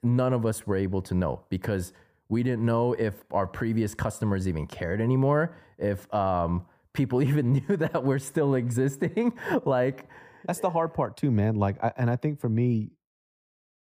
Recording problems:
muffled; slightly; fading above 2 kHz

